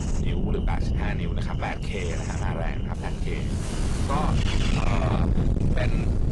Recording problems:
distortion; heavy; 7 dB below the speech
garbled, watery; slightly; nothing above 10.5 kHz
wind noise on the microphone; heavy; 3 dB below the speech
animal sounds; loud; throughout; 2 dB below the speech

